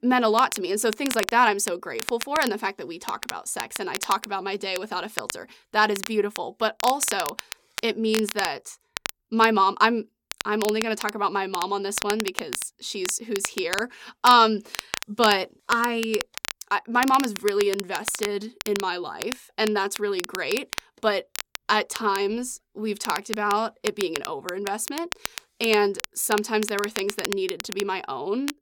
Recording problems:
crackle, like an old record; loud; 9 dB below the speech

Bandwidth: 17 kHz